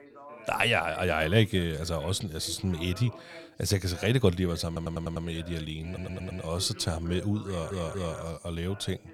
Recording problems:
background chatter; noticeable; throughout; 2 voices, 20 dB below the speech
audio stuttering; at 4.5 s, at 6 s and at 7.5 s

